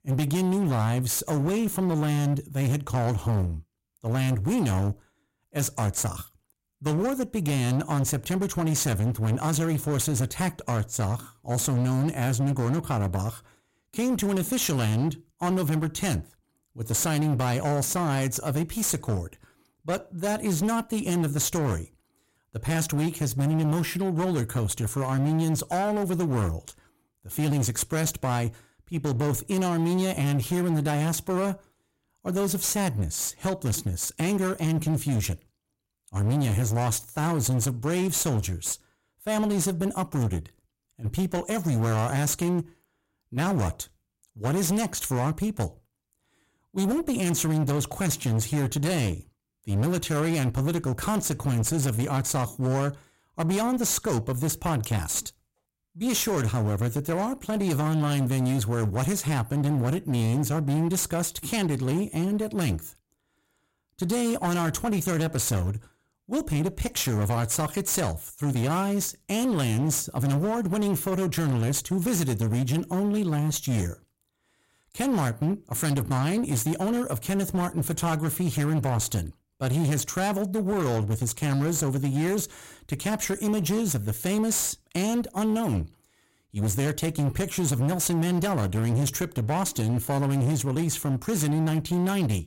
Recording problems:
distortion; slight; 24% of the sound clipped

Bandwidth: 16 kHz